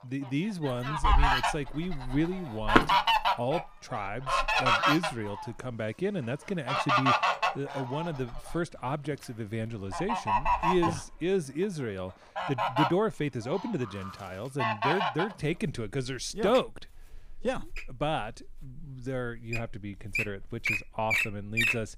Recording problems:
animal sounds; very loud; throughout; 5 dB above the speech

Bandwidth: 15.5 kHz